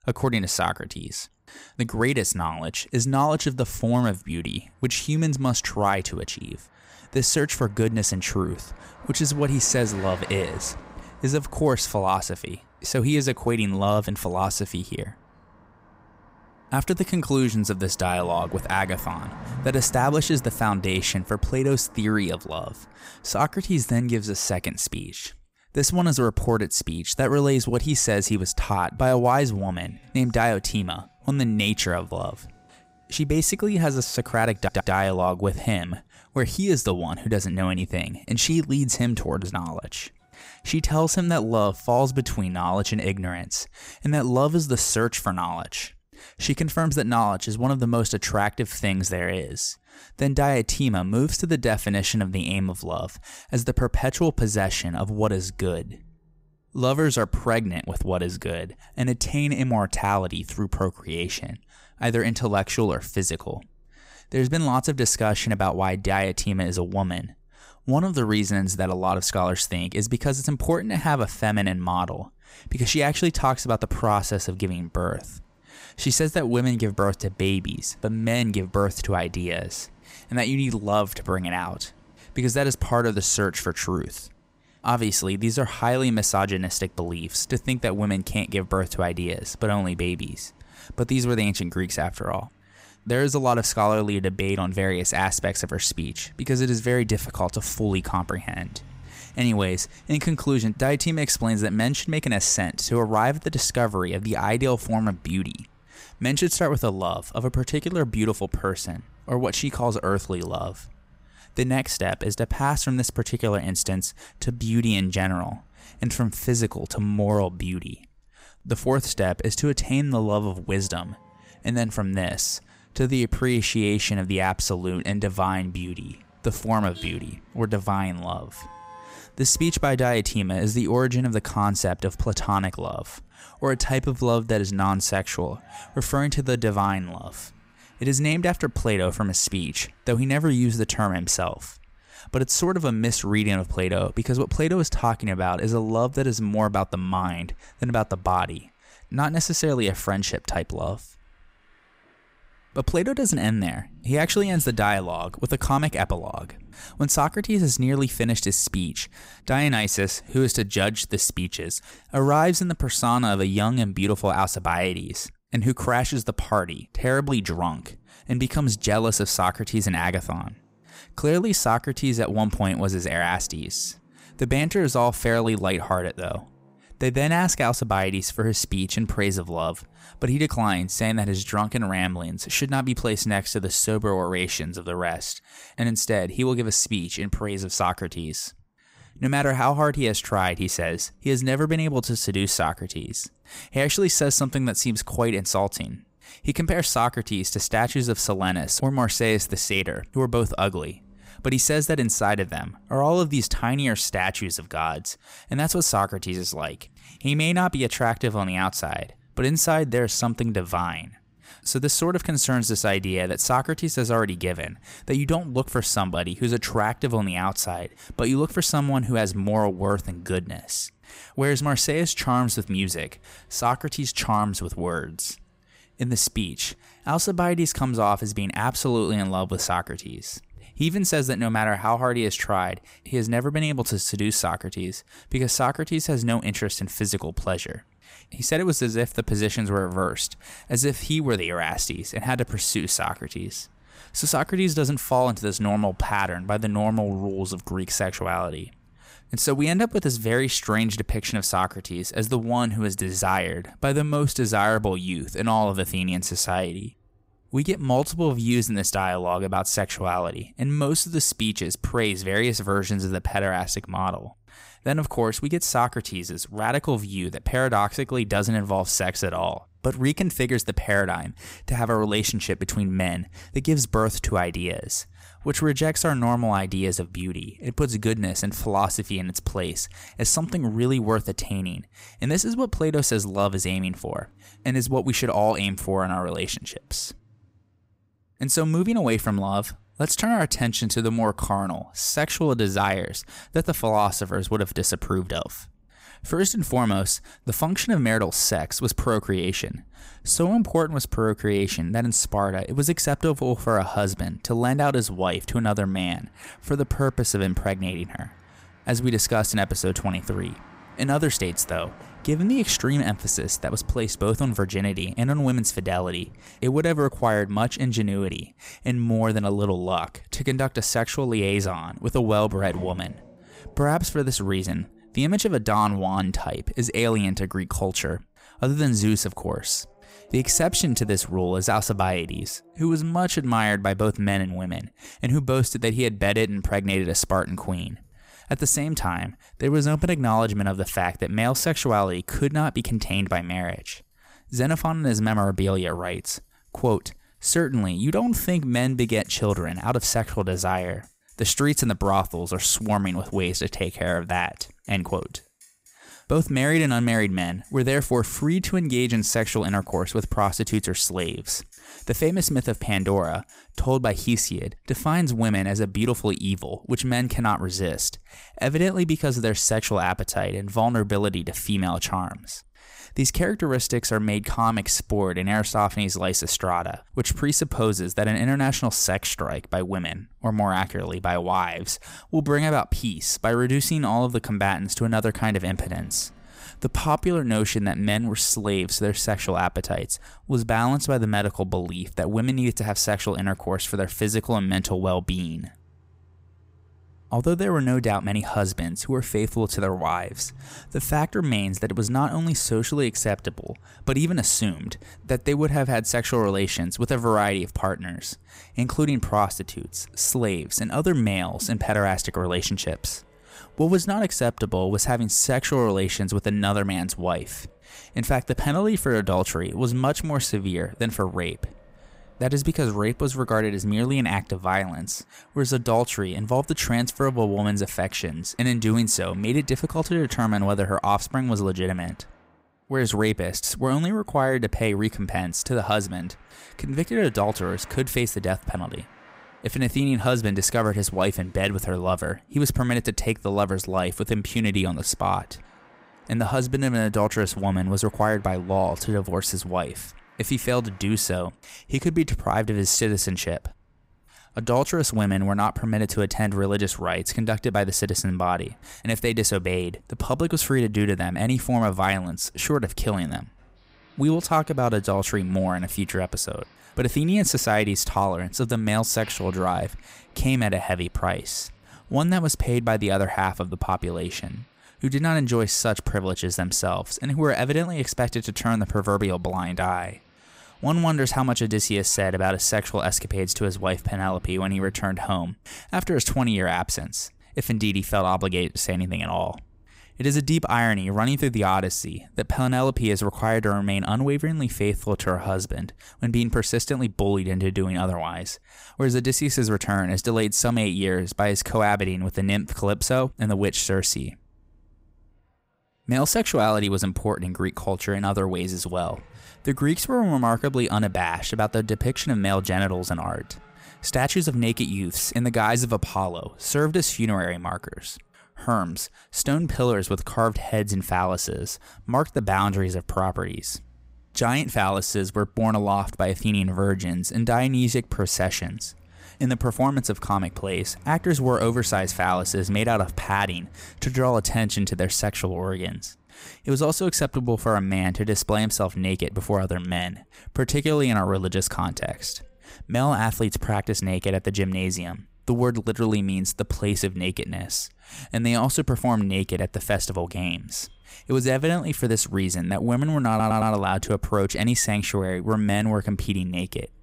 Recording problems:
traffic noise; faint; throughout; 30 dB below the speech
audio stuttering; at 35 s and at 9:13

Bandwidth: 15.5 kHz